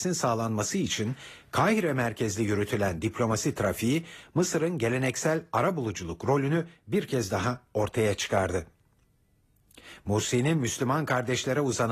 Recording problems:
garbled, watery; slightly; nothing above 14.5 kHz
abrupt cut into speech; at the start and the end

